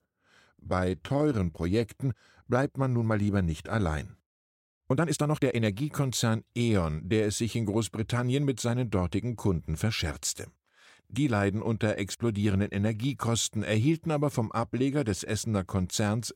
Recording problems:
uneven, jittery; strongly; from 0.5 to 5.5 s

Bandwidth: 16 kHz